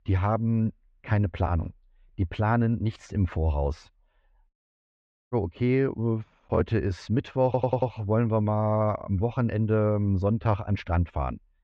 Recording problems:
muffled; very; fading above 2 kHz
audio cutting out; at 4.5 s for 1 s
audio stuttering; at 7.5 s

